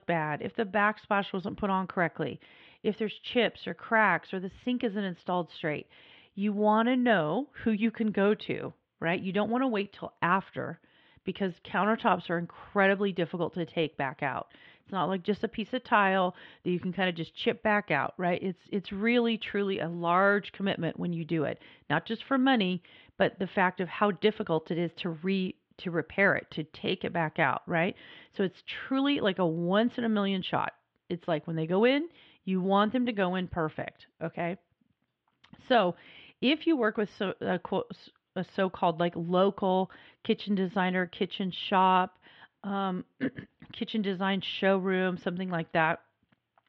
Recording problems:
muffled; very; fading above 3 kHz

